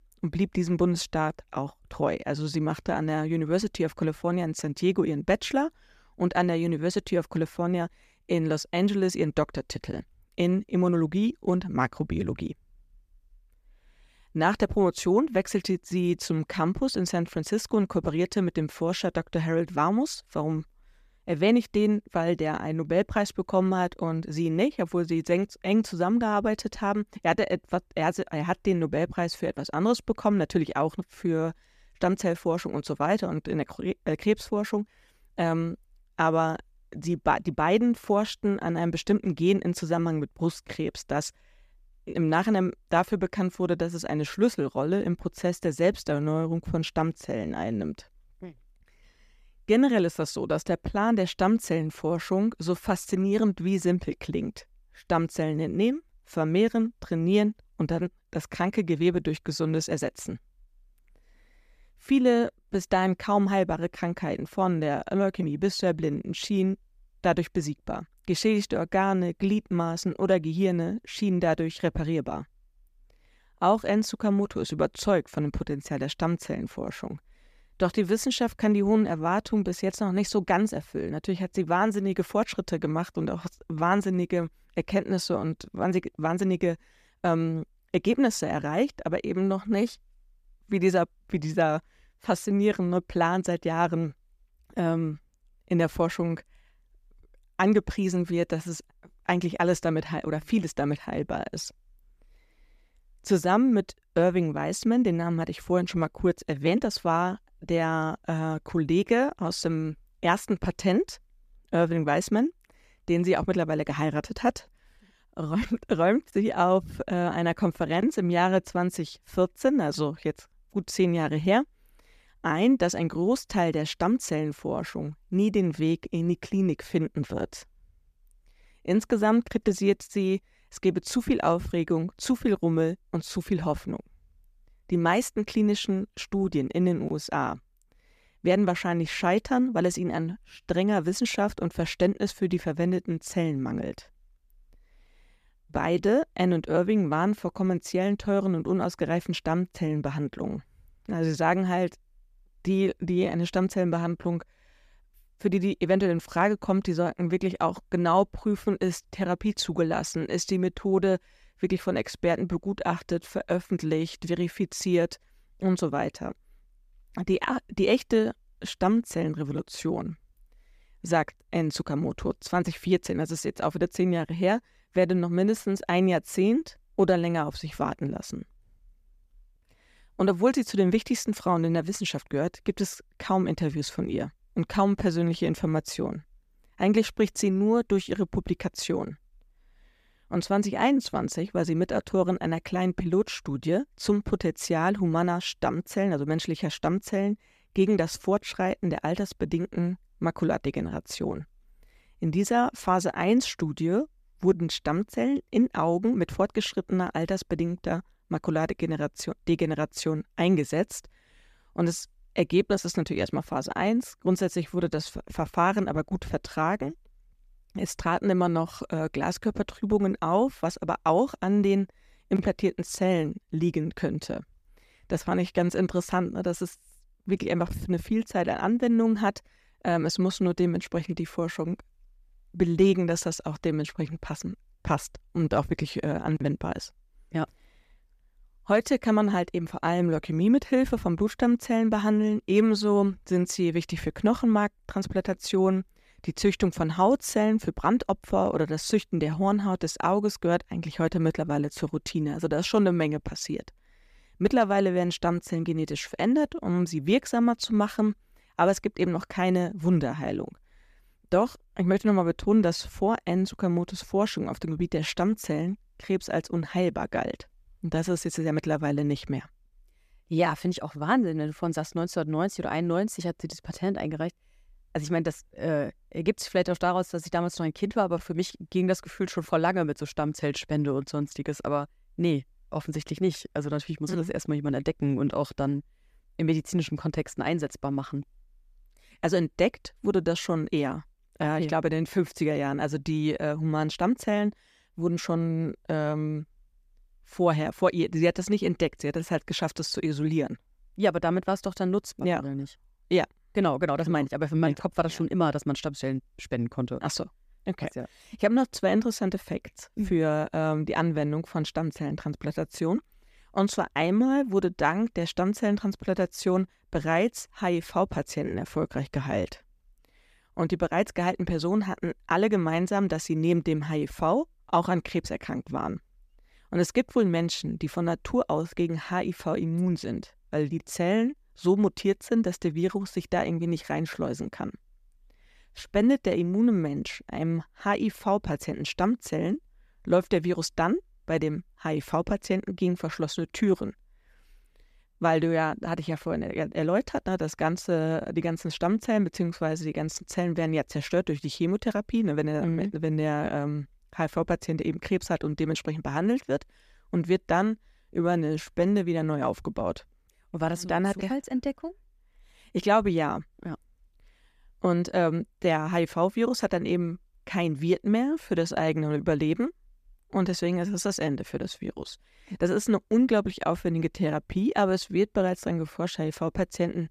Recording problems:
none

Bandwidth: 14.5 kHz